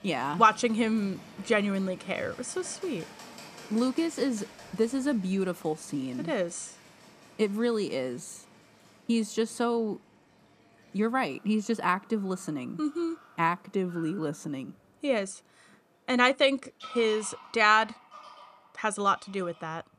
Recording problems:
animal sounds; faint; throughout; 20 dB below the speech

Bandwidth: 14.5 kHz